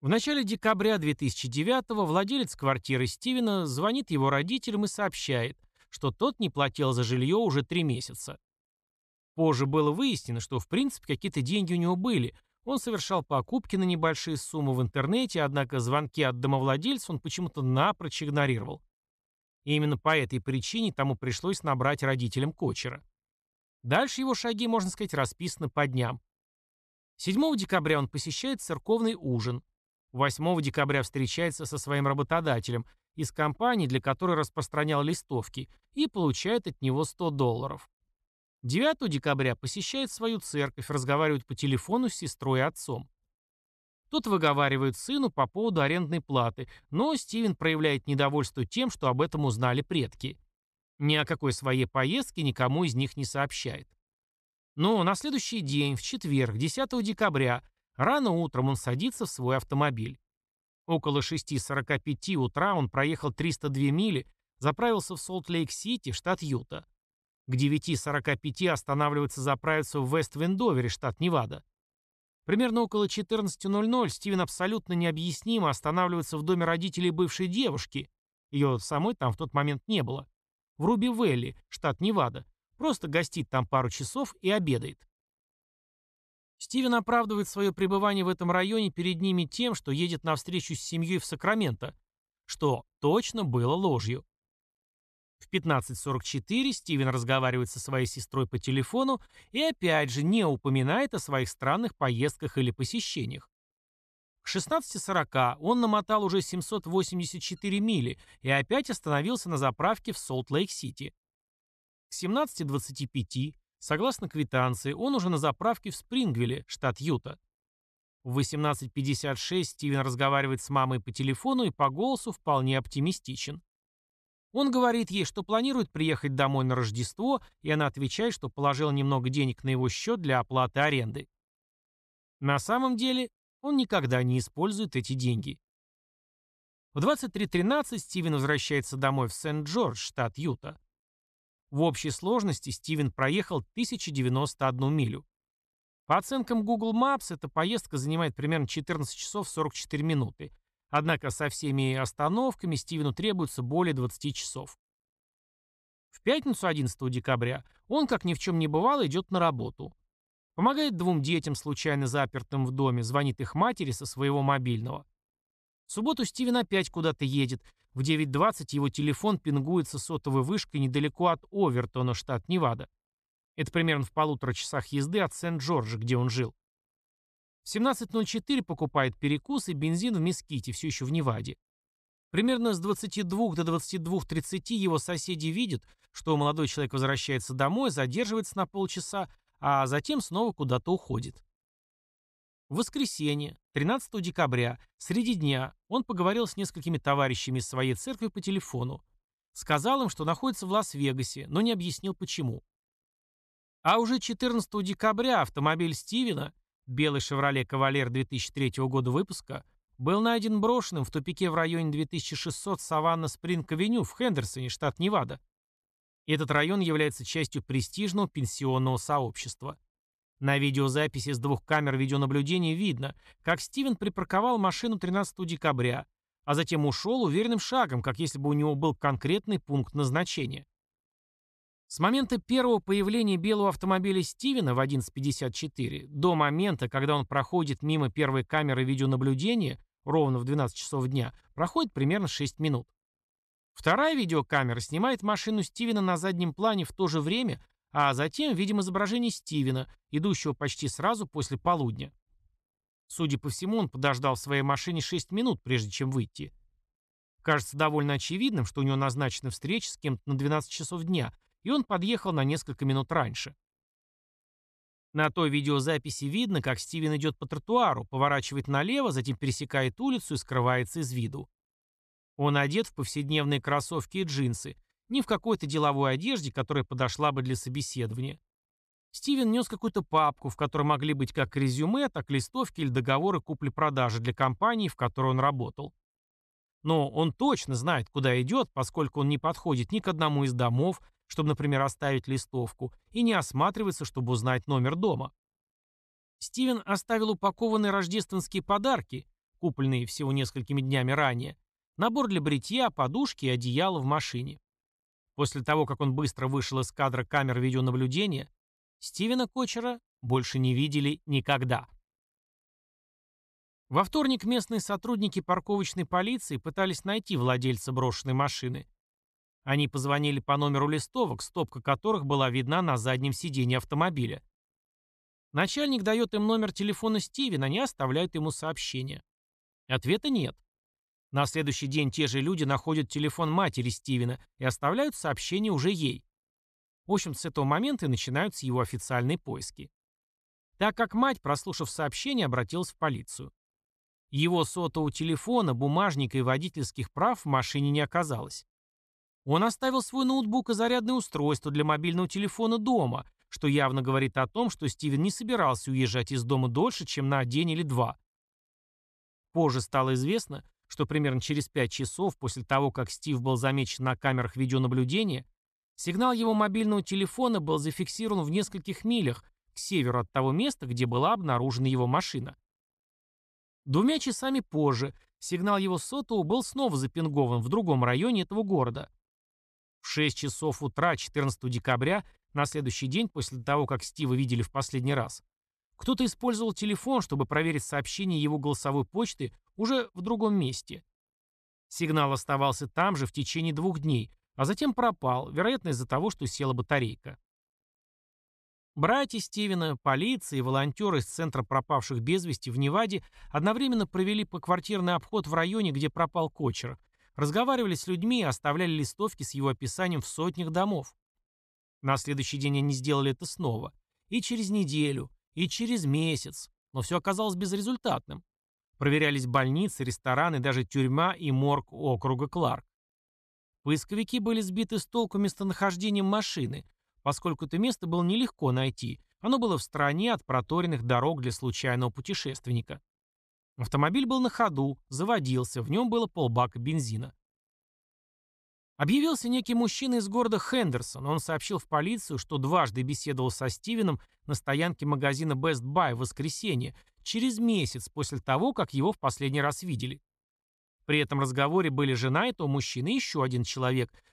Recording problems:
uneven, jittery; slightly; from 4 s to 7:02

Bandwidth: 14 kHz